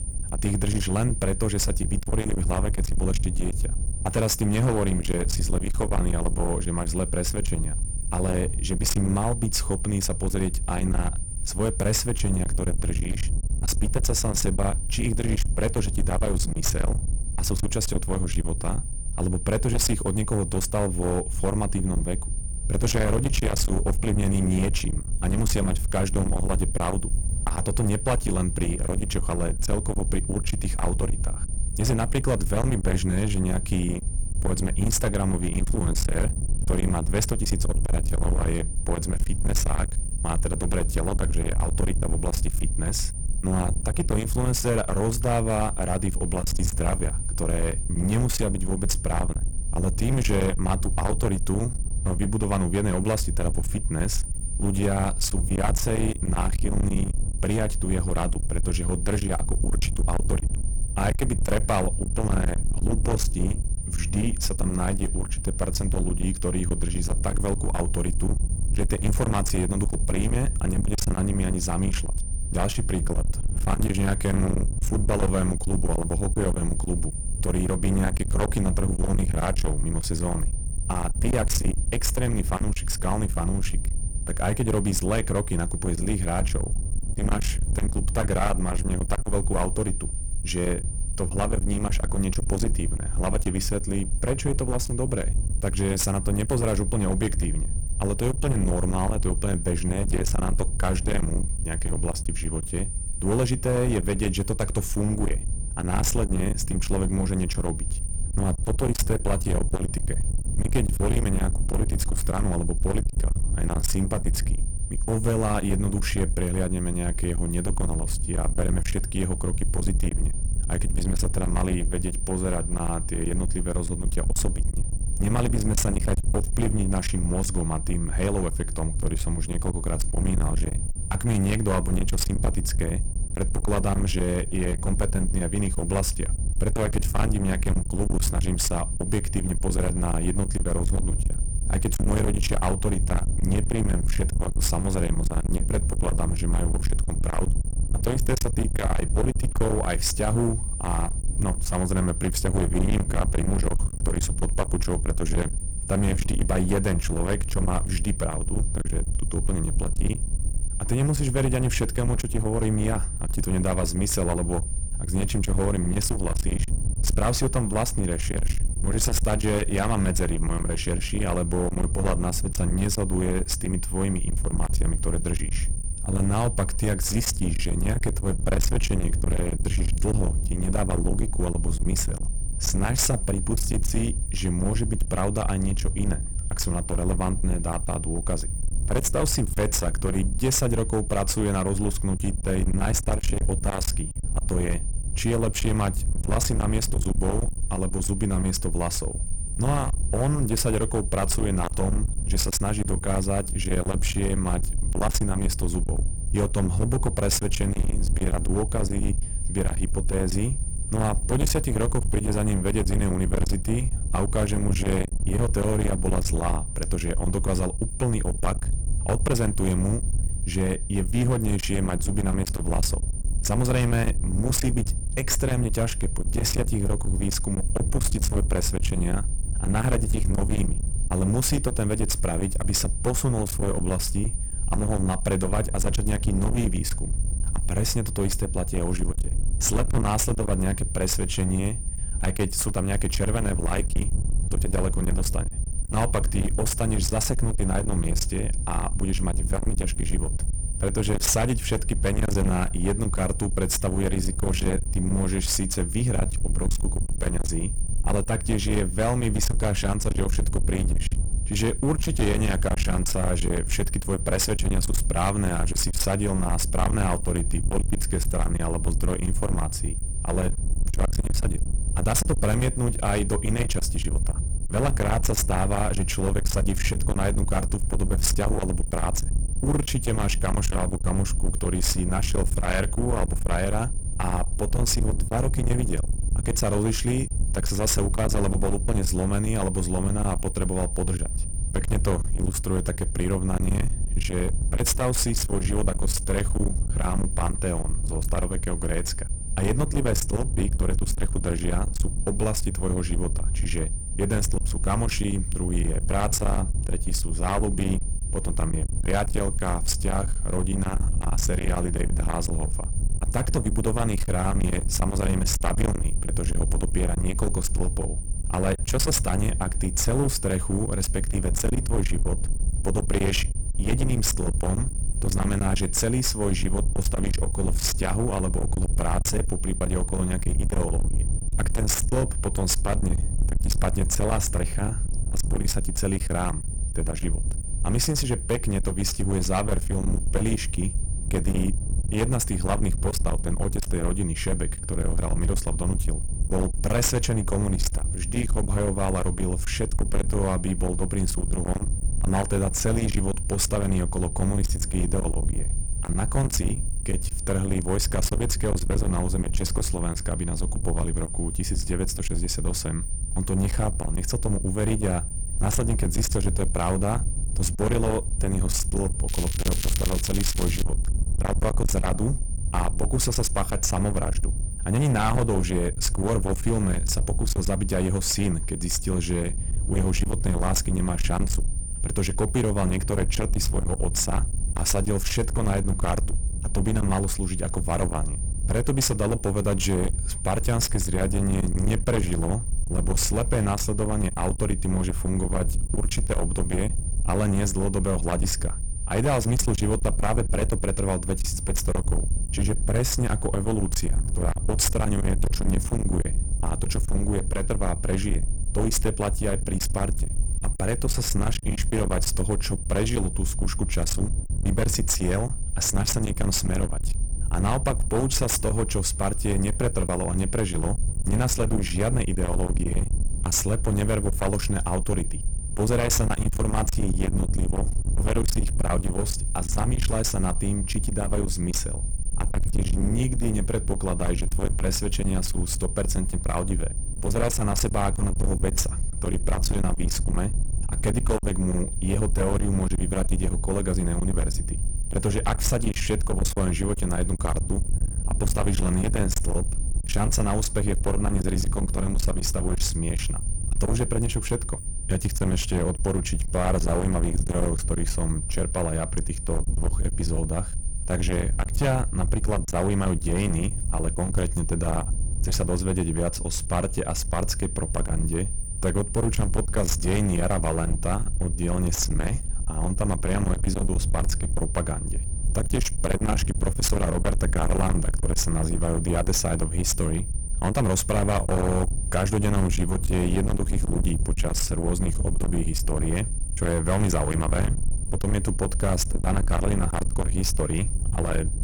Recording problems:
distortion; heavy; 29% of the sound clipped
wind noise on the microphone; heavy; 10 dB below the speech
high-pitched whine; loud; throughout; 9 kHz, 9 dB below the speech
crackling; loud; from 6:09 to 6:11; 7 dB below the speech

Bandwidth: 18.5 kHz